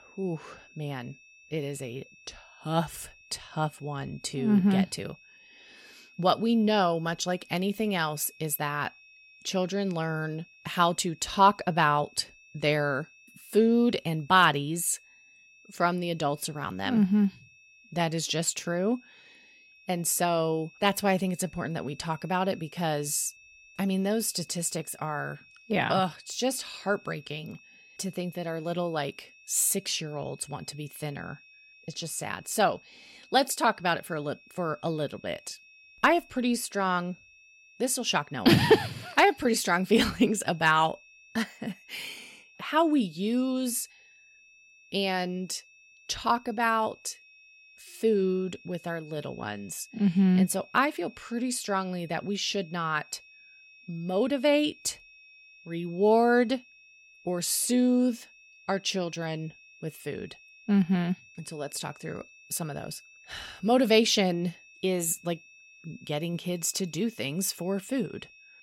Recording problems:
high-pitched whine; faint; throughout; 2.5 kHz, 25 dB below the speech

